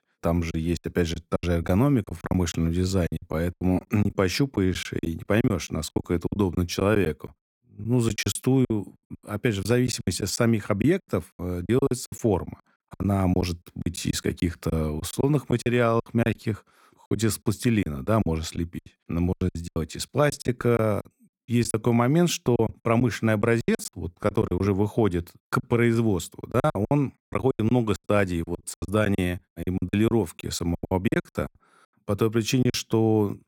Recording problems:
choppy; very; 15% of the speech affected

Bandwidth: 17 kHz